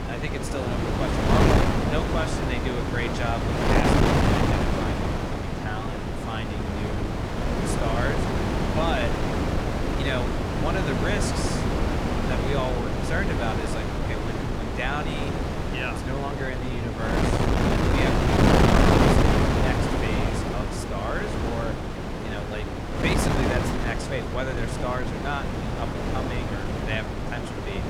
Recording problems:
wind noise on the microphone; heavy; 4 dB above the speech

